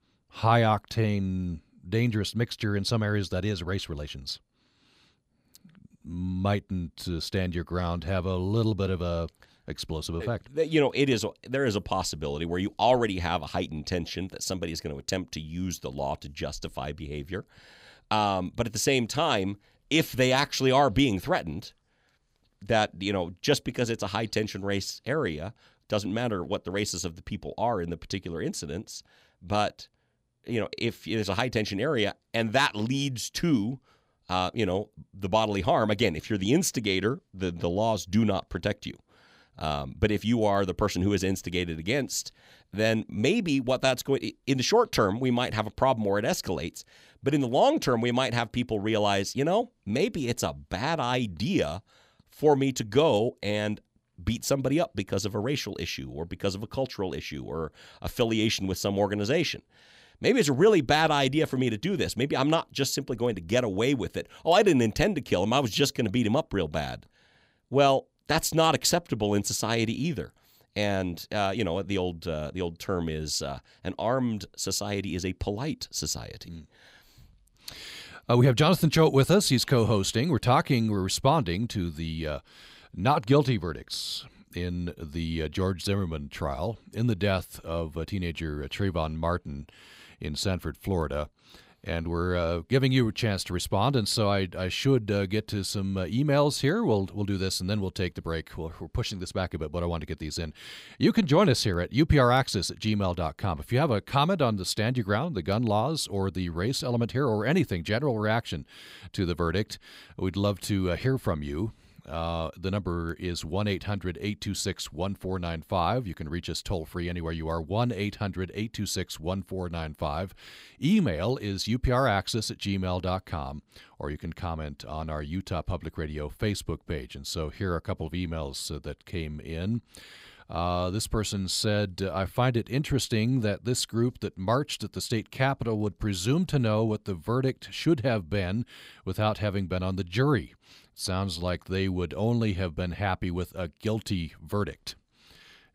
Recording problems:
none

